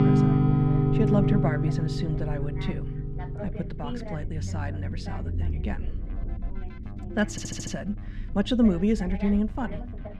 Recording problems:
muffled; very slightly; fading above 3 kHz
background music; very loud; throughout; 4 dB above the speech
voice in the background; noticeable; throughout; 15 dB below the speech
low rumble; noticeable; throughout; 20 dB below the speech
audio stuttering; at 7.5 s

